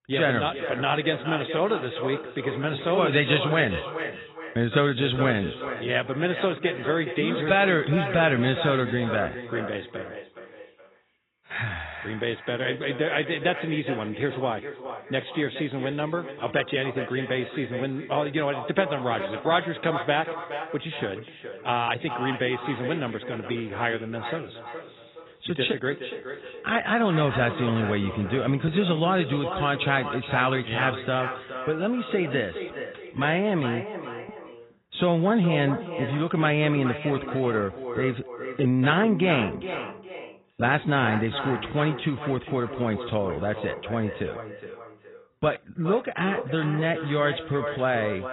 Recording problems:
echo of what is said; strong; throughout; 420 ms later, 9 dB below the speech
garbled, watery; badly; nothing above 4 kHz

